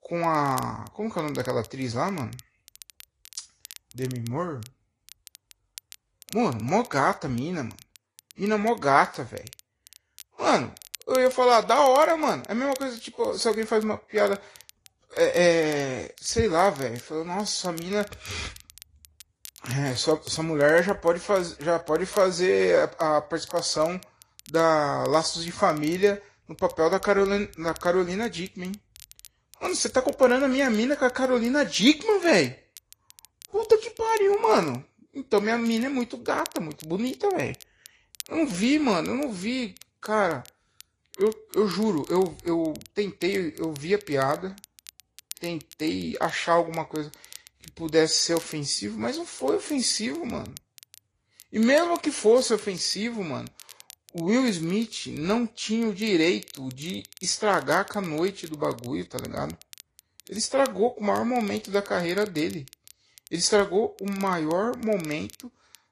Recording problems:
garbled, watery; slightly; nothing above 10.5 kHz
crackle, like an old record; faint; 20 dB below the speech

